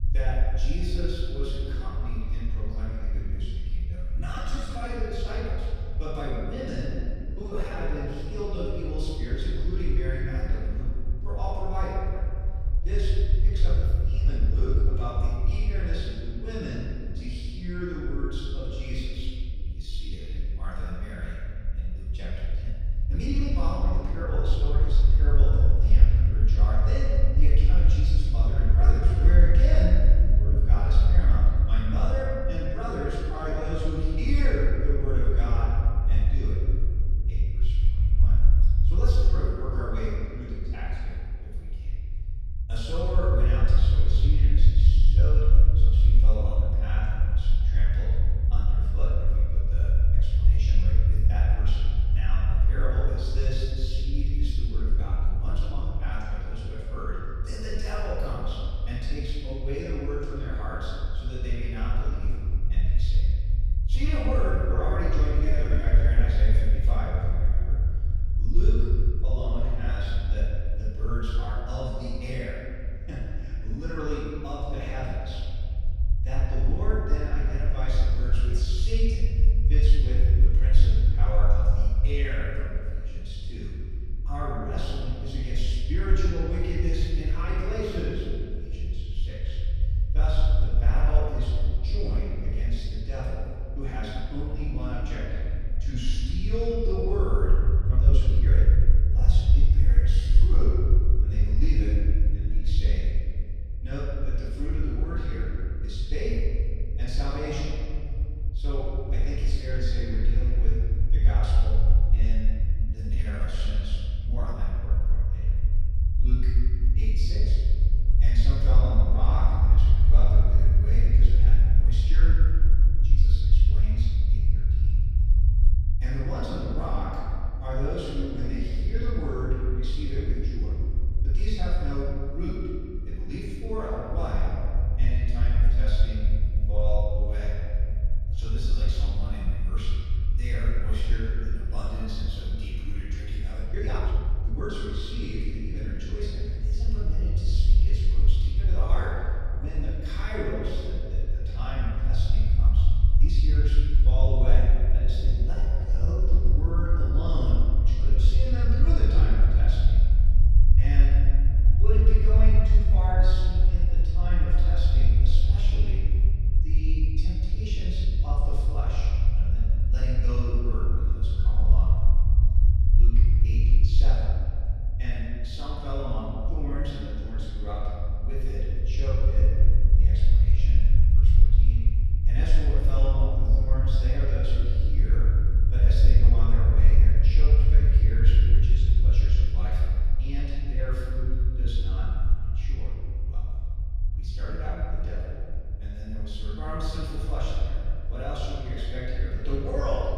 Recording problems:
room echo; strong; dies away in 2.1 s
off-mic speech; far
low rumble; loud; throughout; 8 dB below the speech
uneven, jittery; strongly; from 4 s to 2:36

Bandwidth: 14.5 kHz